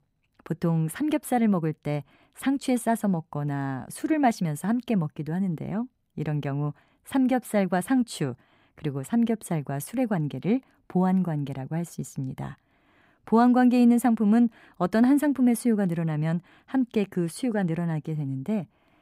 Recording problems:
none

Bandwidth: 15.5 kHz